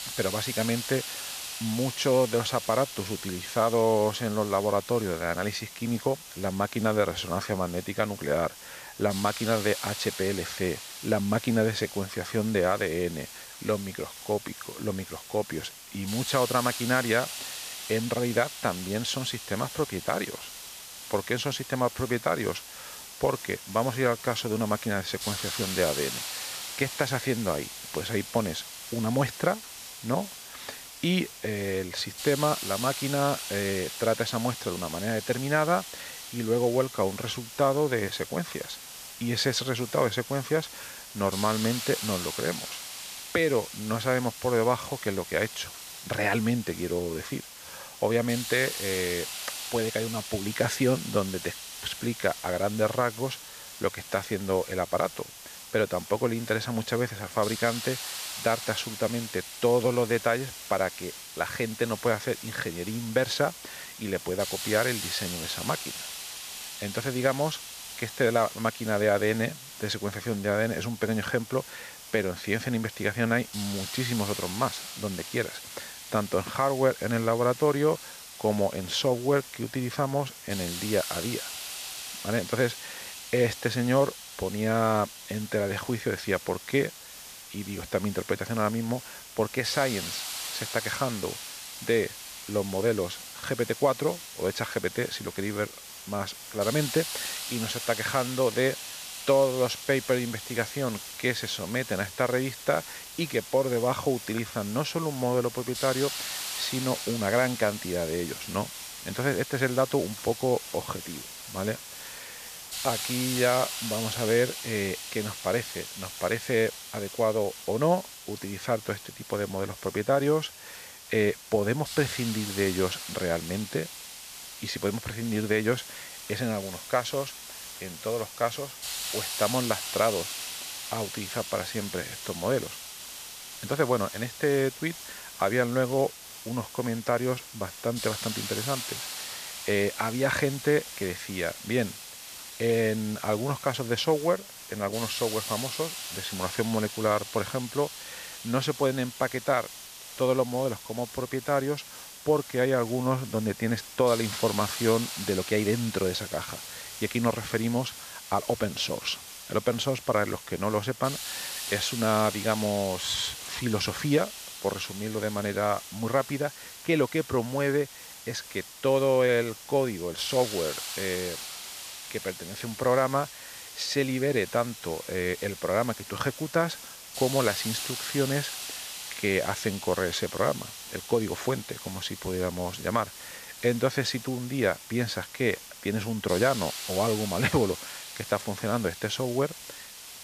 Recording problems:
hiss; loud; throughout; 8 dB below the speech

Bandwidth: 14.5 kHz